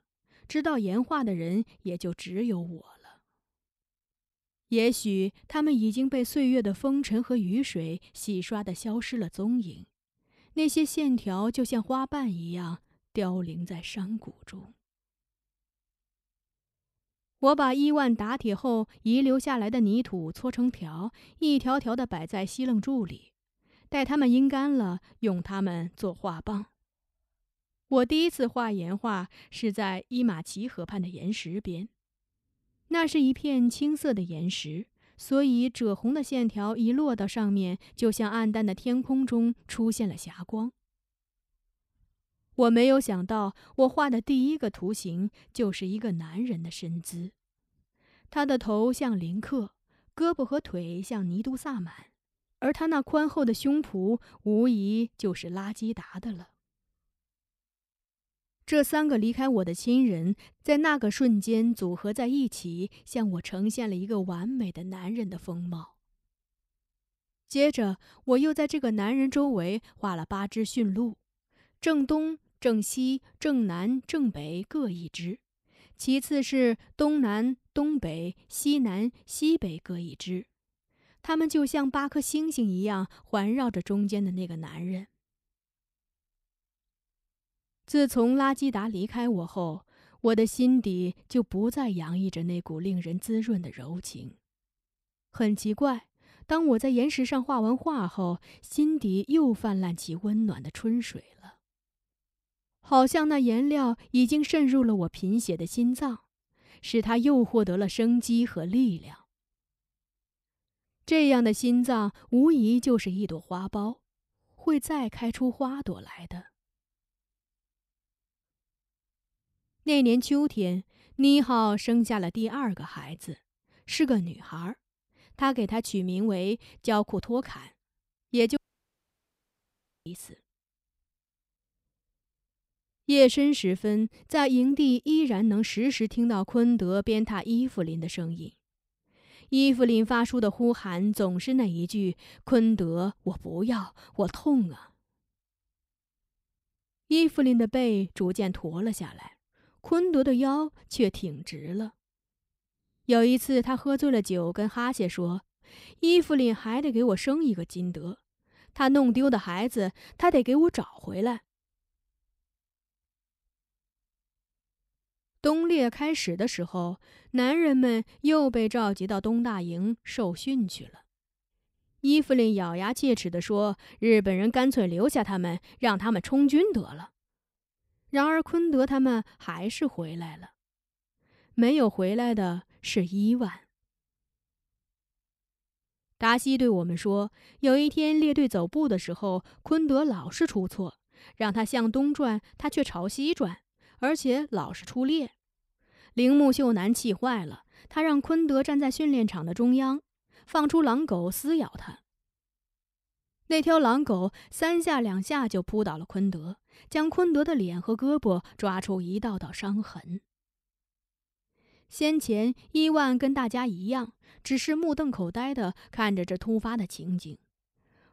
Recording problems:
audio cutting out; at 2:09 for 1.5 s

